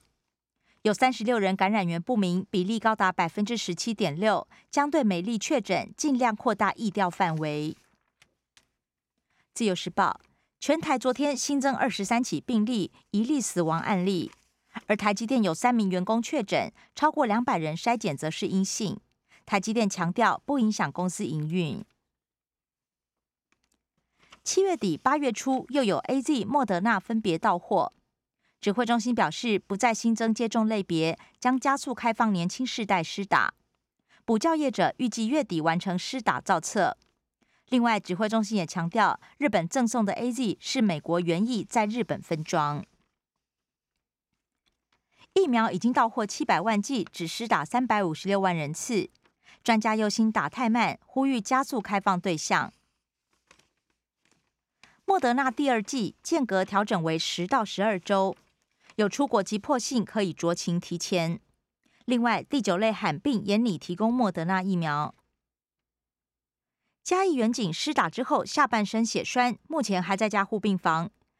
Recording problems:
none

